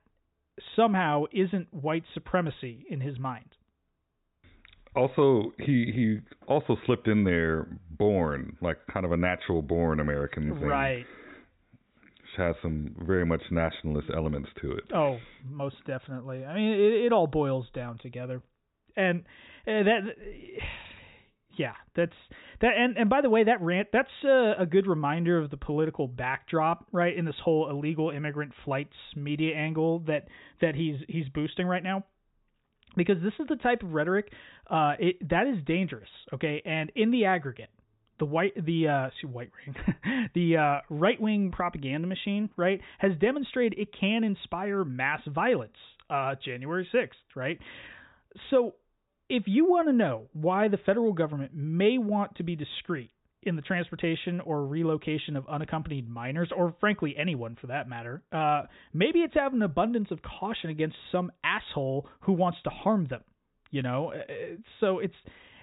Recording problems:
high frequencies cut off; severe; nothing above 4 kHz

